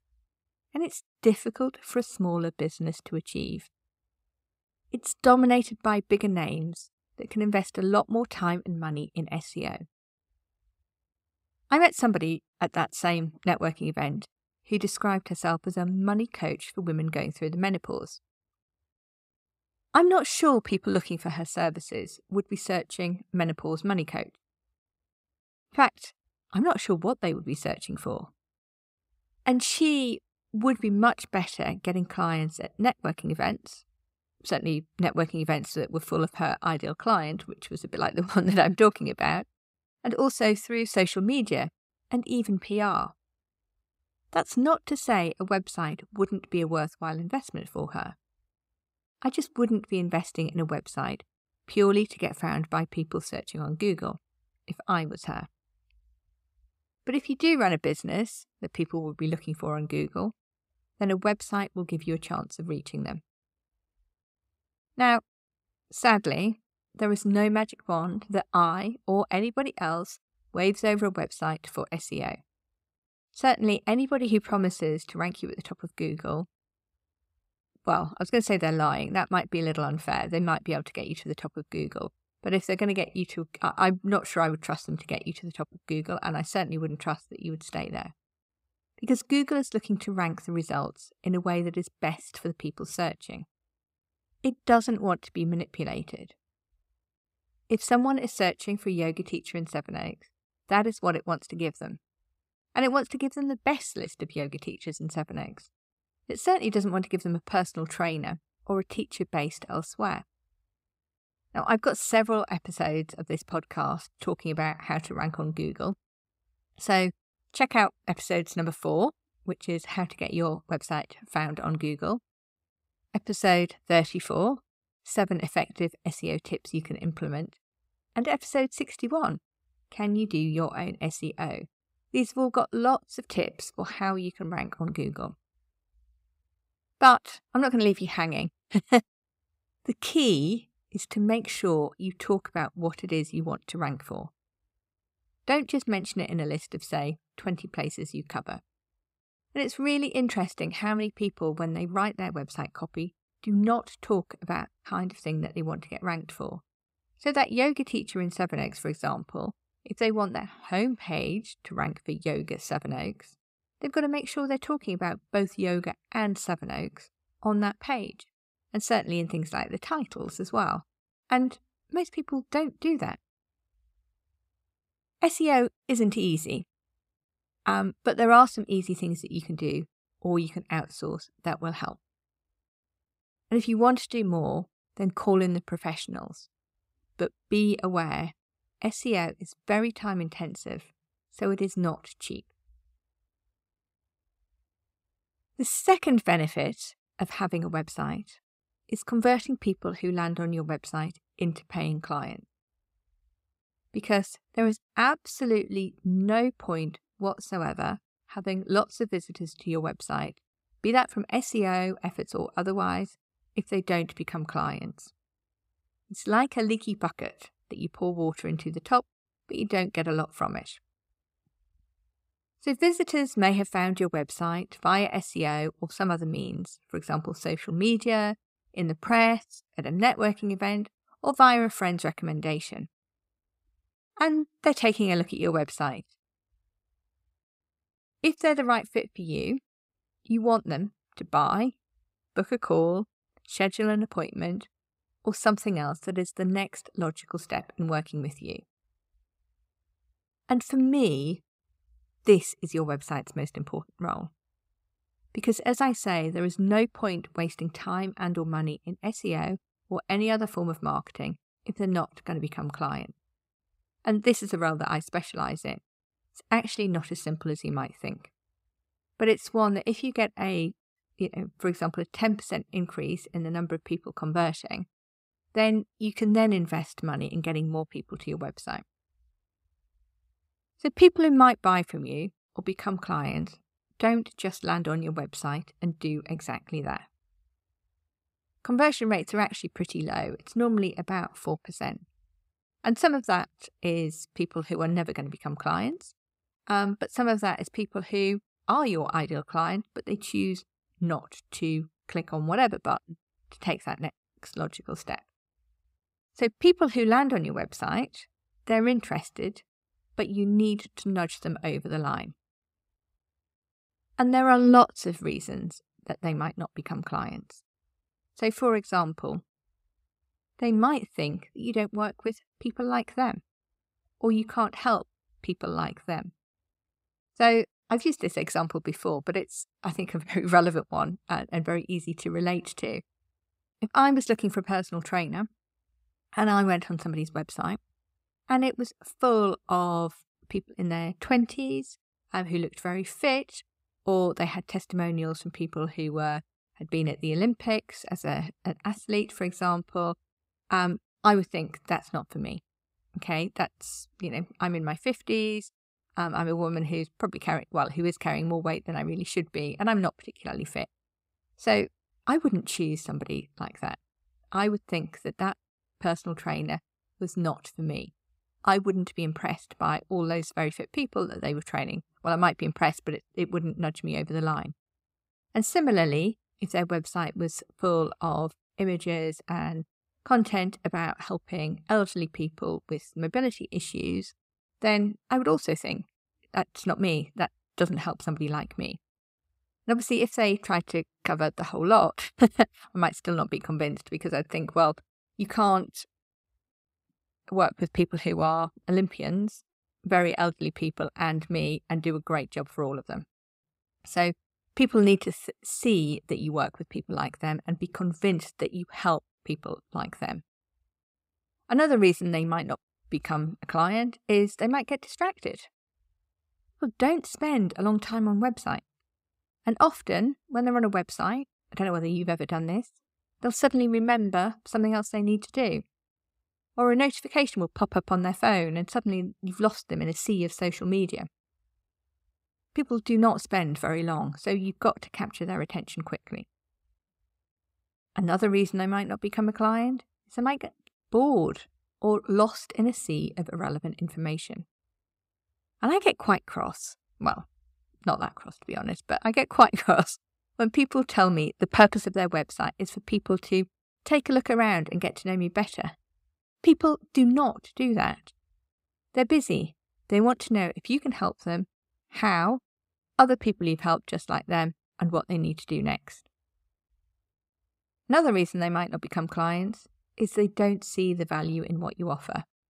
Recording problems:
none

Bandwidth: 15.5 kHz